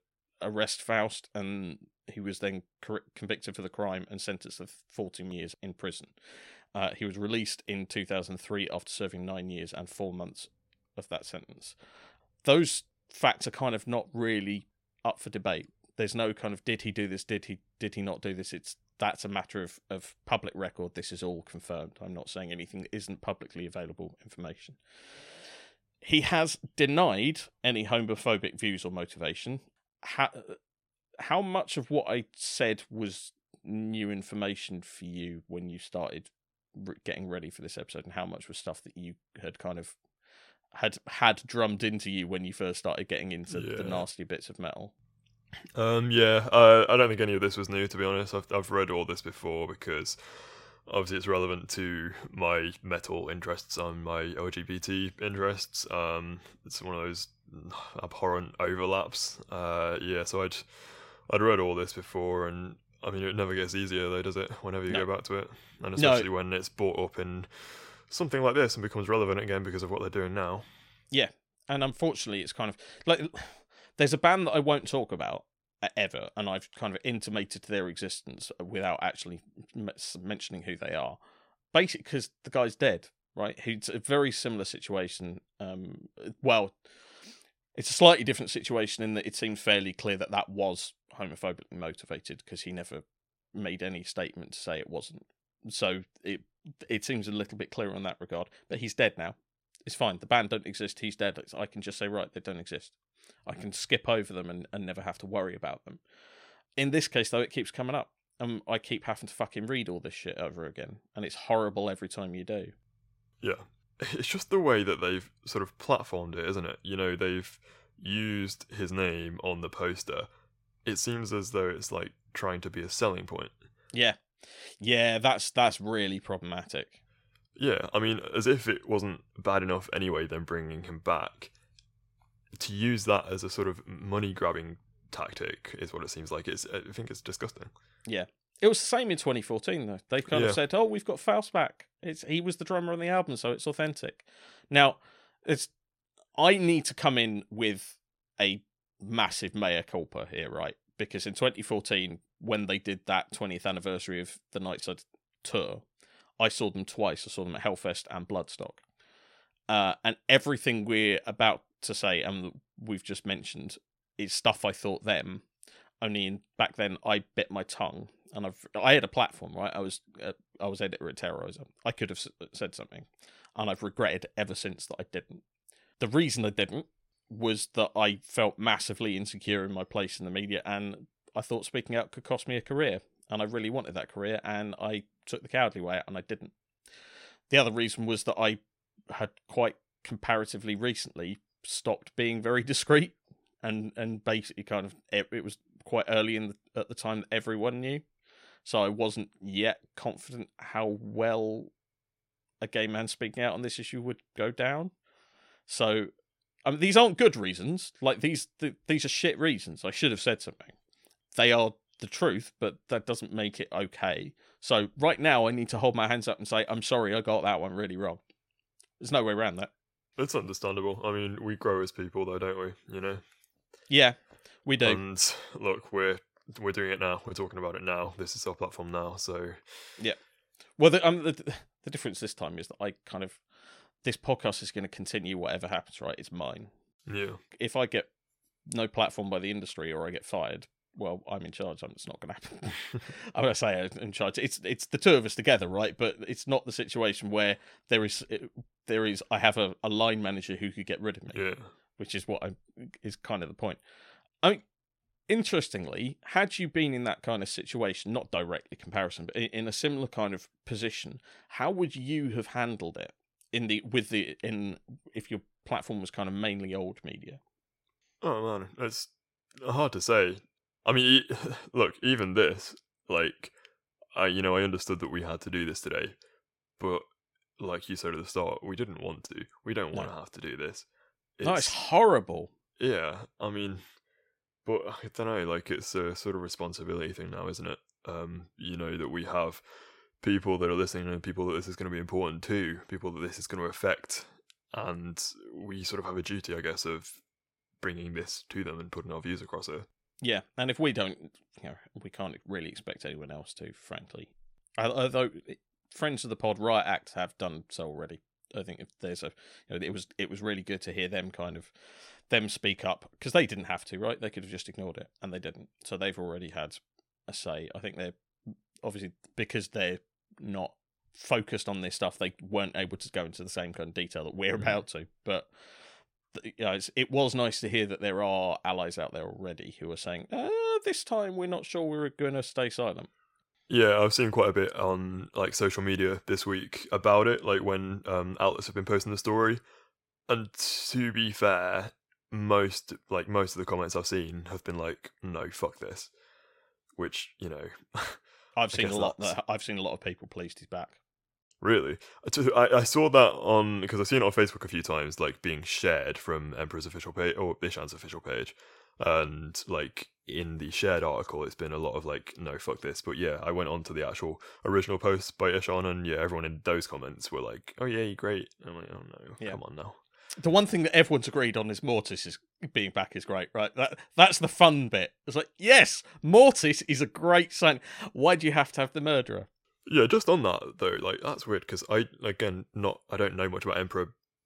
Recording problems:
none

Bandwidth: 16 kHz